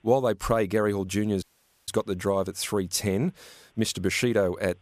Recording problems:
audio cutting out; at 1.5 s

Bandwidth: 14.5 kHz